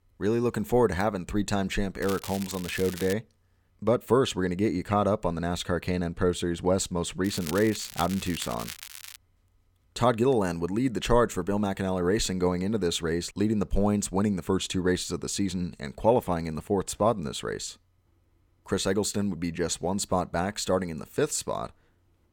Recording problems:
crackling; noticeable; from 2 to 3 s and from 7 to 9 s; 10 dB below the speech

